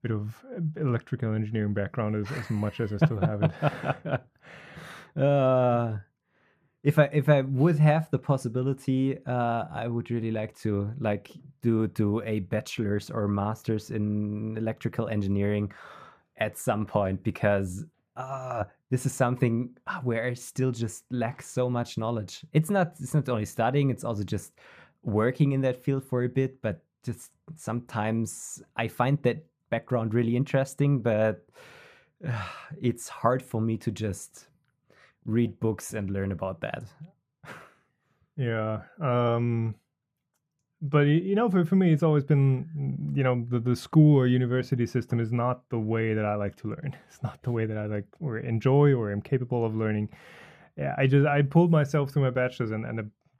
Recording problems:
muffled; slightly; fading above 2 kHz

